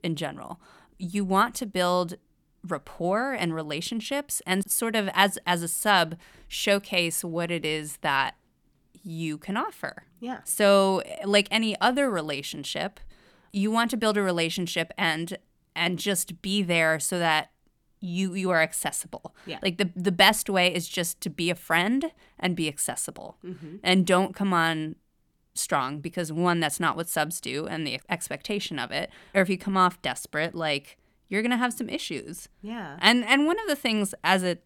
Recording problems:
none

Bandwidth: 18.5 kHz